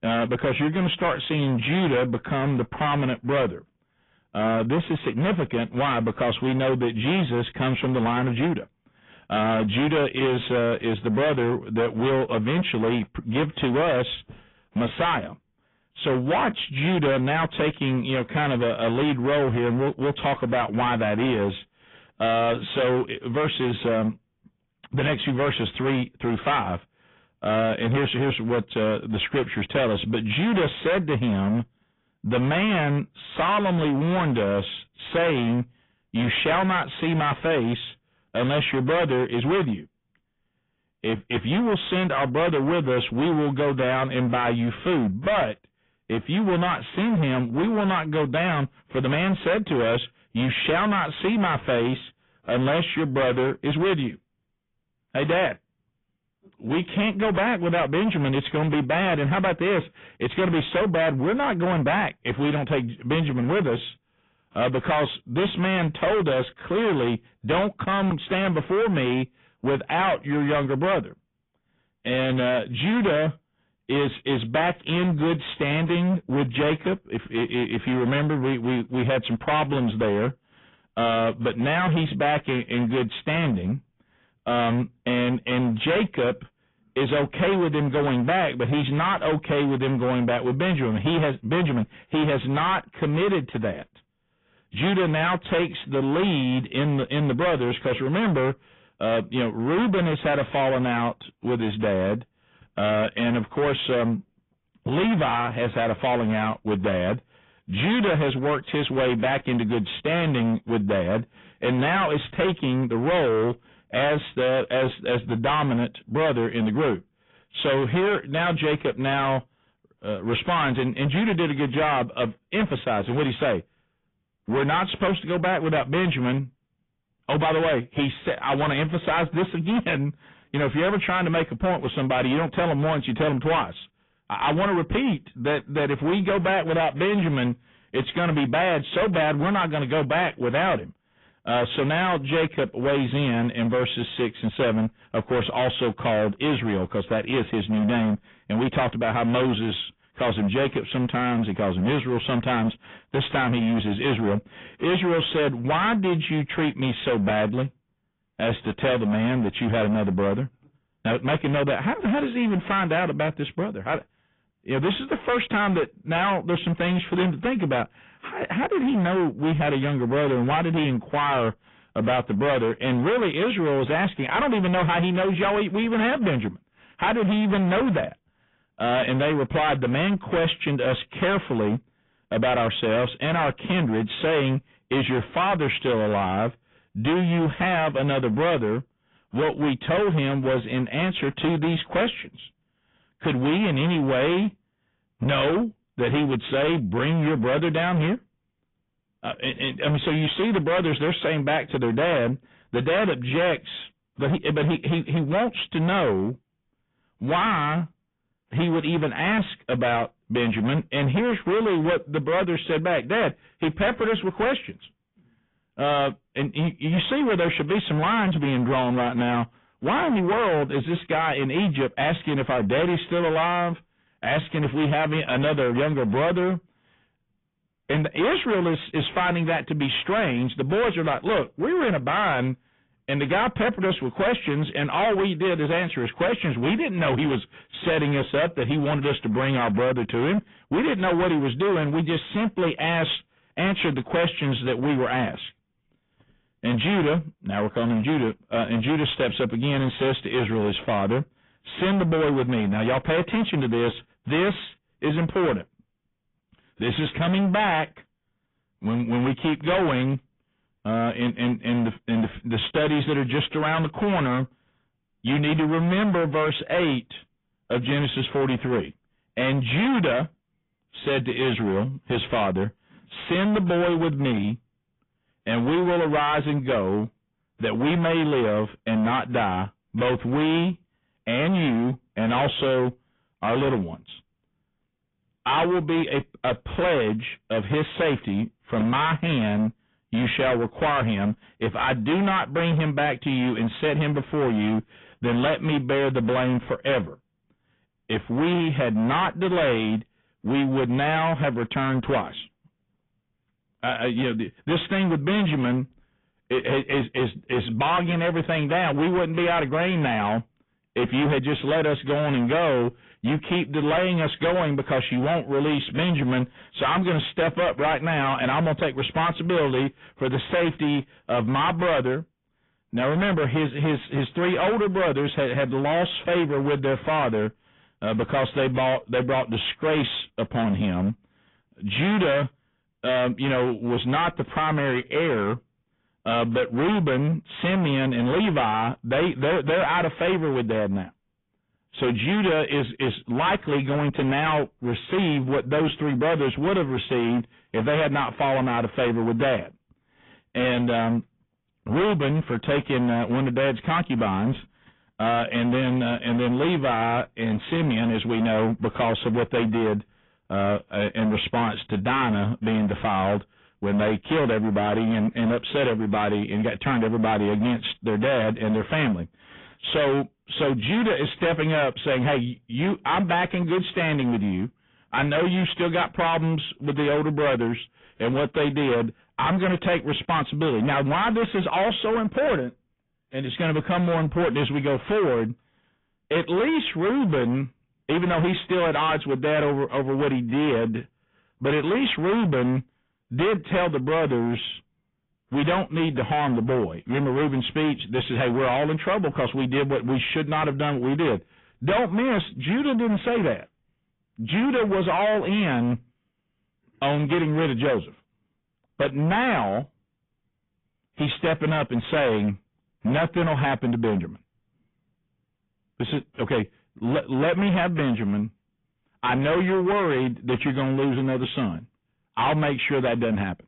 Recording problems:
distortion; heavy; 22% of the sound clipped
high frequencies cut off; severe; nothing above 3.5 kHz
garbled, watery; slightly

